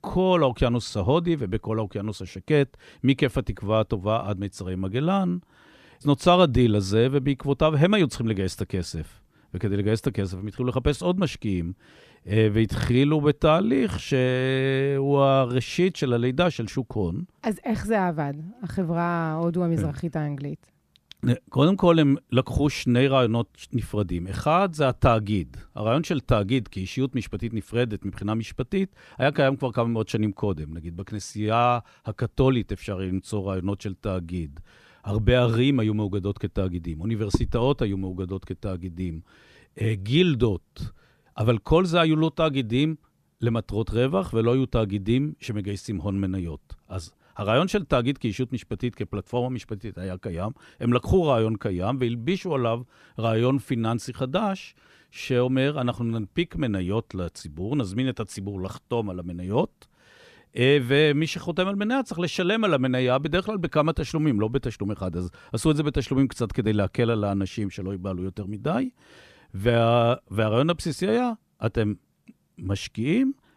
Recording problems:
none

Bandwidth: 14.5 kHz